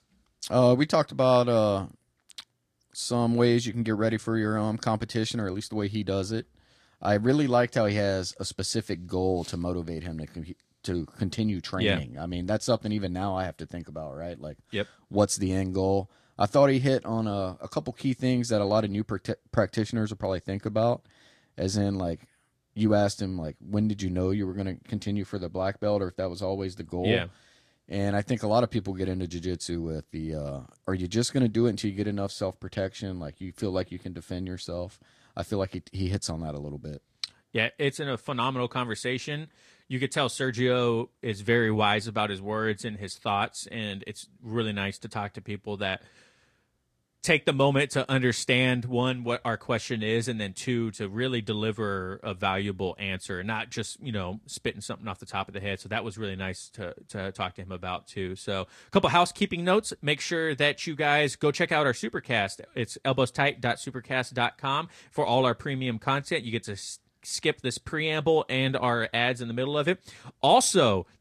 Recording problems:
garbled, watery; slightly

